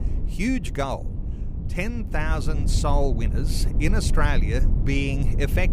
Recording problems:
low rumble; noticeable; throughout; 10 dB below the speech

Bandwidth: 15 kHz